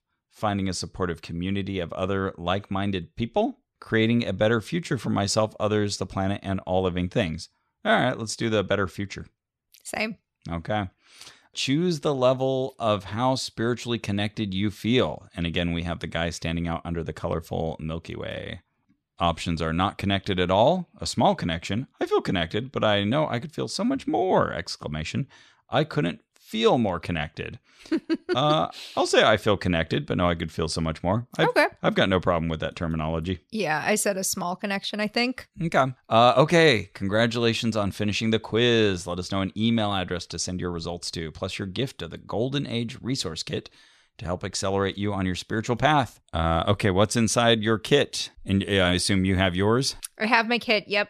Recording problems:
none

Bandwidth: 13.5 kHz